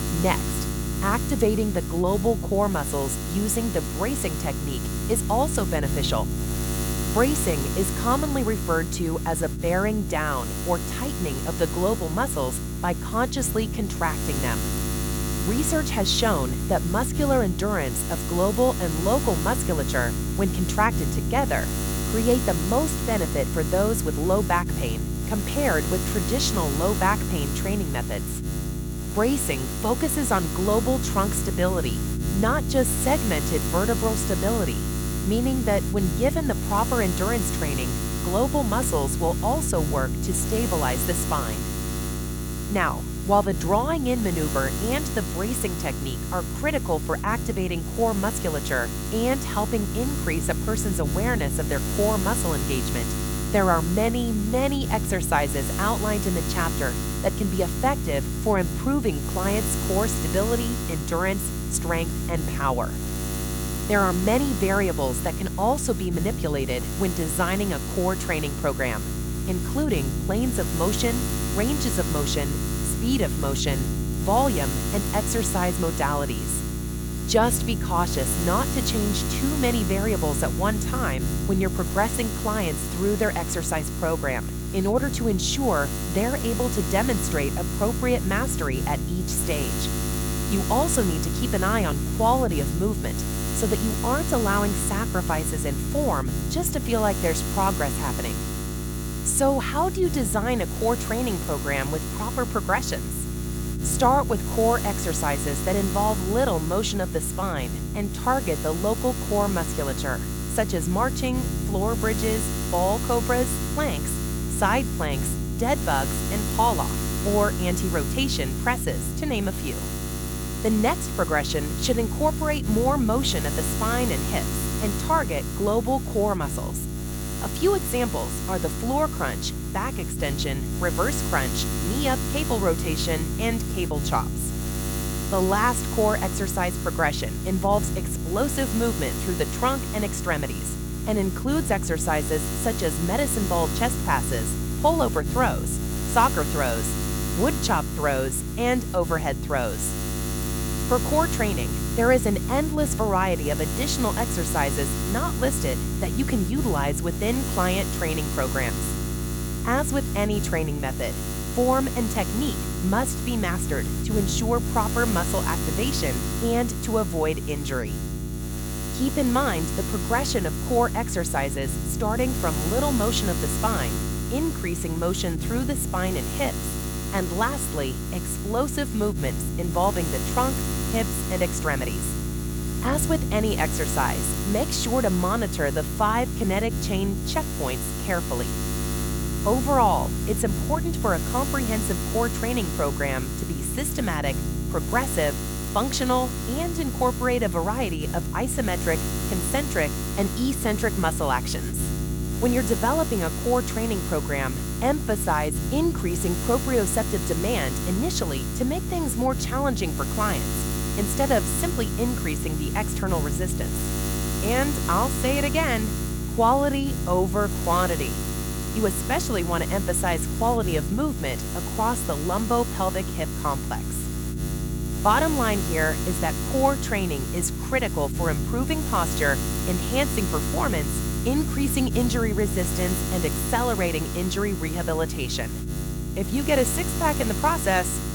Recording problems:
electrical hum; loud; throughout; 60 Hz, 8 dB below the speech

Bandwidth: 18.5 kHz